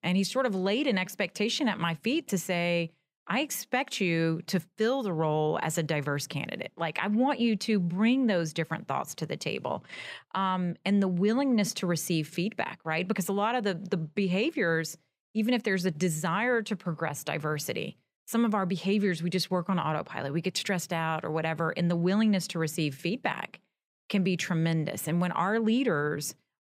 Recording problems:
none

